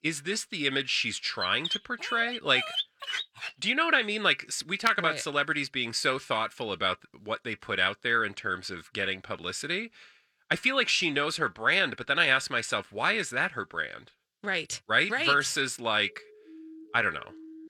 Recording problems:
thin; somewhat; fading below 1 kHz
dog barking; noticeable; from 1.5 to 3.5 s; peak 3 dB below the speech
siren; faint; from 16 s on; peak 20 dB below the speech

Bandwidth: 17 kHz